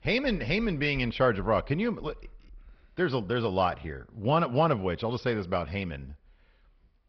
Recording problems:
high frequencies cut off; noticeable; nothing above 5.5 kHz
garbled, watery; slightly

